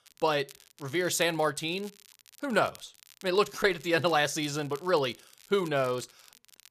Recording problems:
crackle, like an old record; faint; 25 dB below the speech

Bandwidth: 14.5 kHz